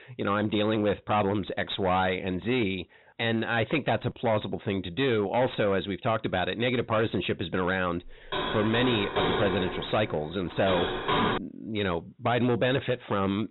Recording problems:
high frequencies cut off; severe; nothing above 4 kHz
distortion; slight; 11% of the sound clipped
door banging; loud; from 8 to 11 s; peak 2 dB above the speech

